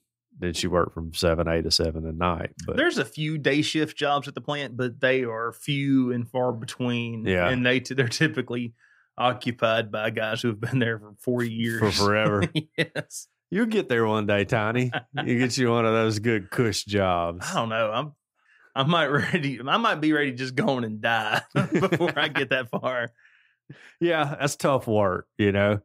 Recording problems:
uneven, jittery; strongly; from 4 to 25 s

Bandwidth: 15.5 kHz